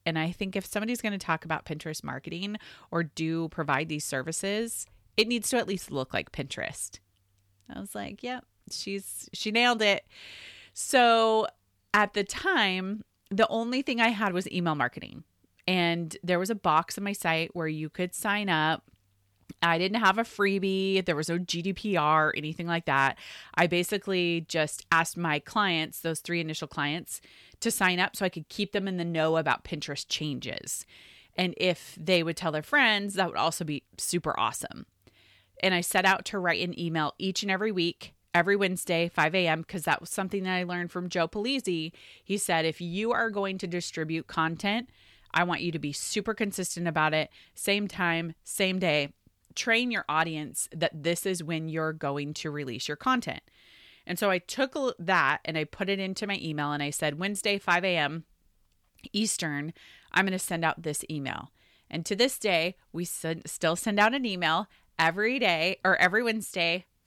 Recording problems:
none

